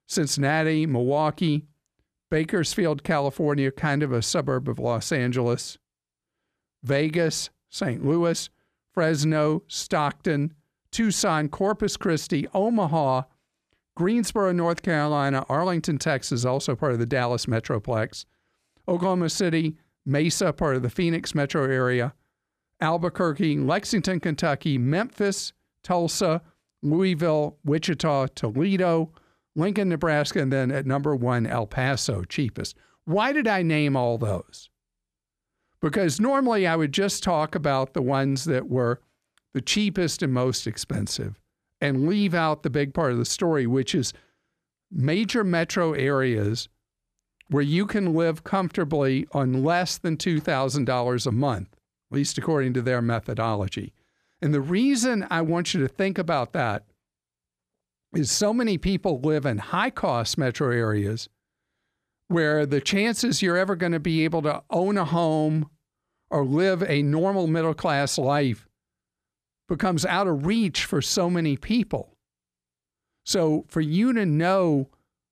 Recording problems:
none

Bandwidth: 14.5 kHz